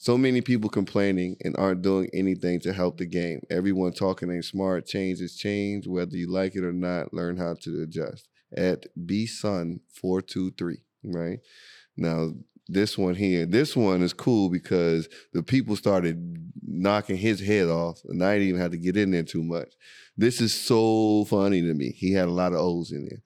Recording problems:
none

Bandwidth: 18 kHz